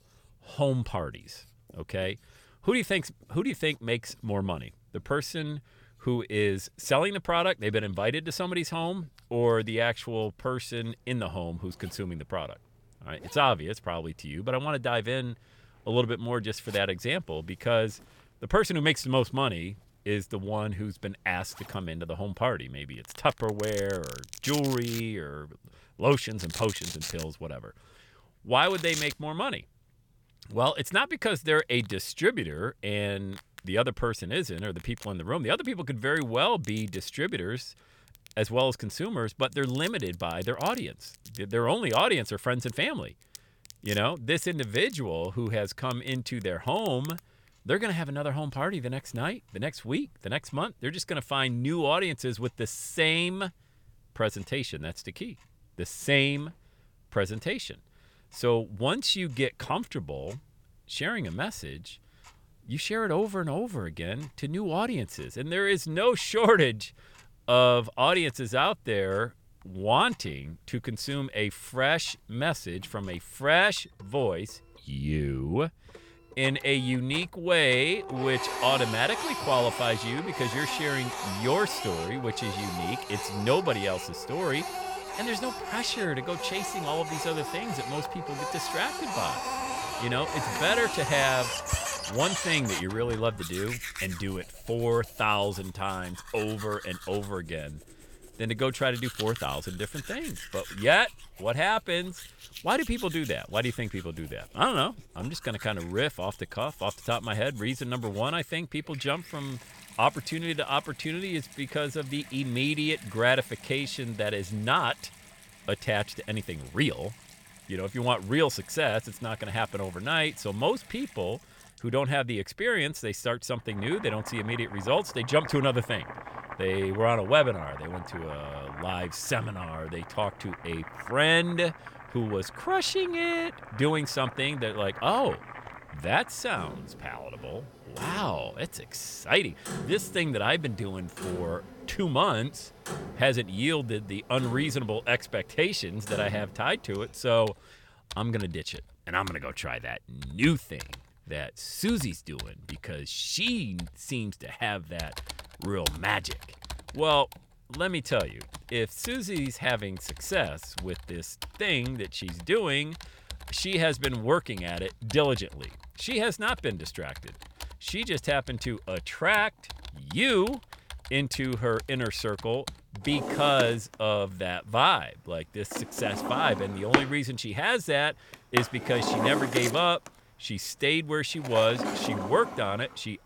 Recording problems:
household noises; loud; throughout; 10 dB below the speech

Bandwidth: 17.5 kHz